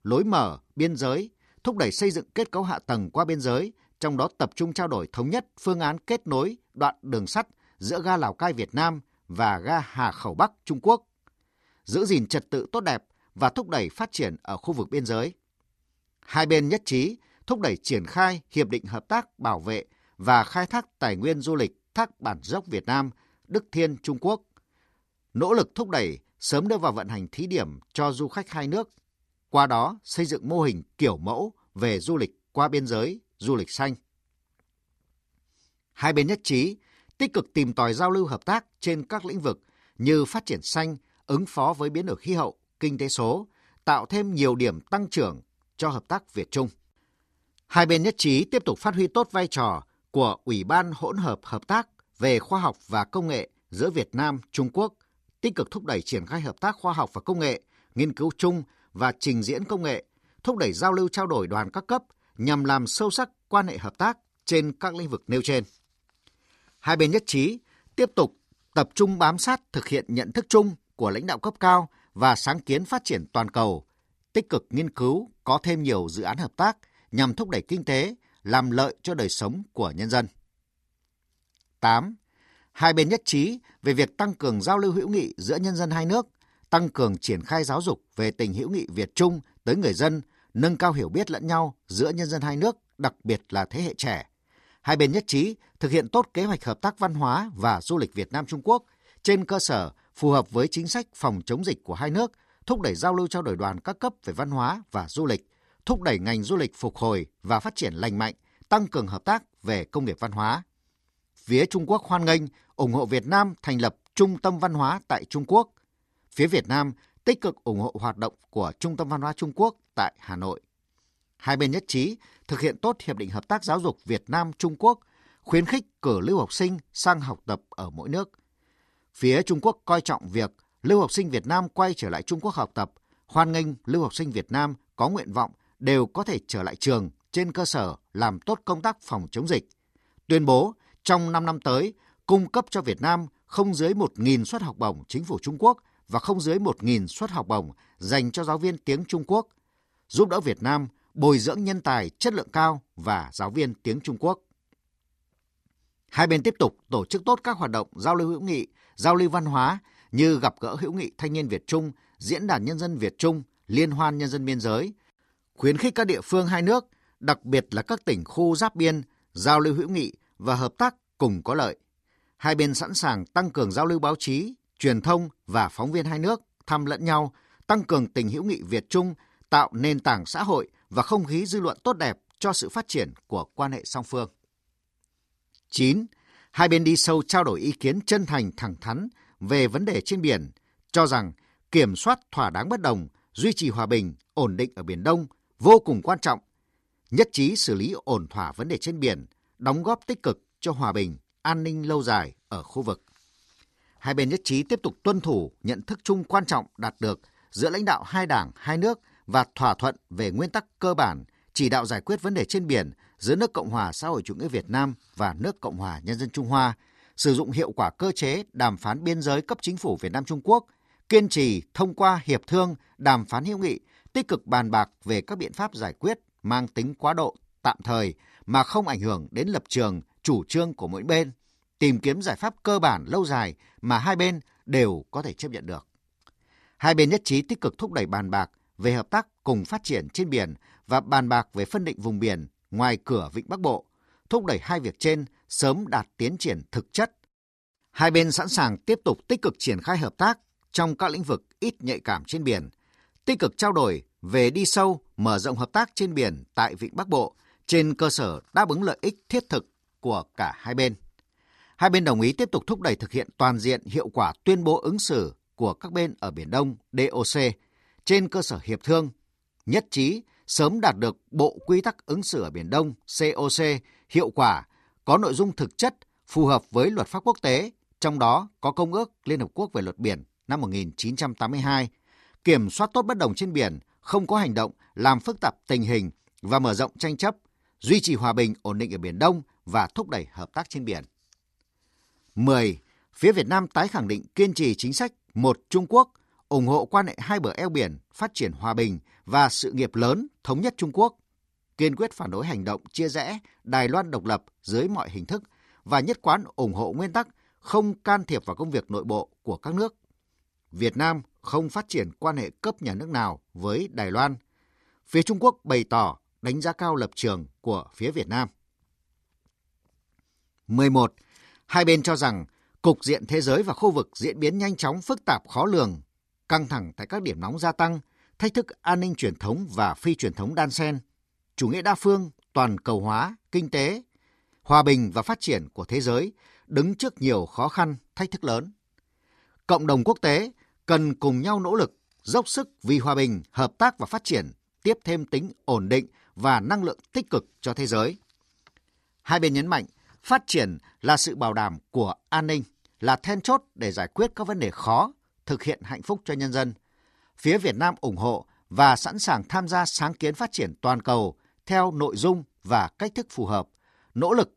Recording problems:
none

